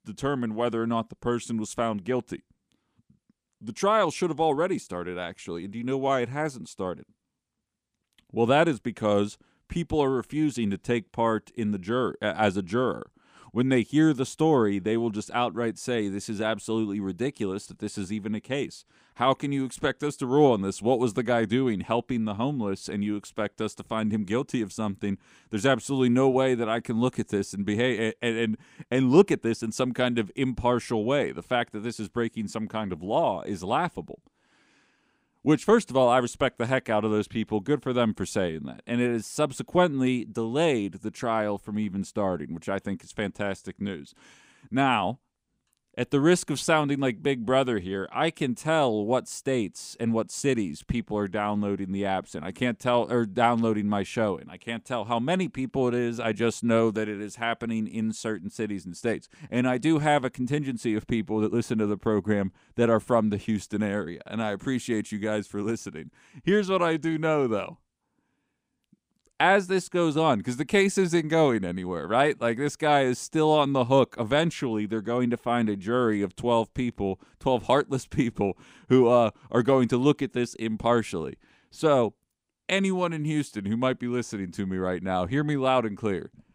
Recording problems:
none

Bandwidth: 15.5 kHz